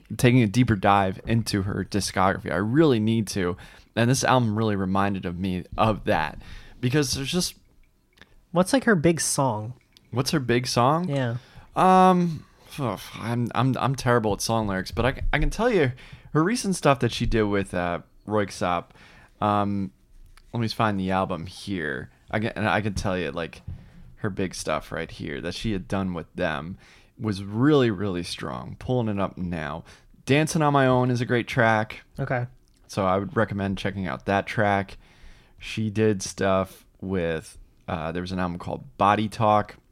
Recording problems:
none

